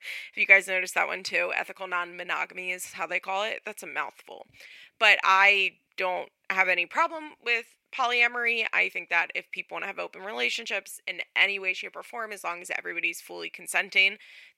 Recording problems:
thin; very; fading below 450 Hz

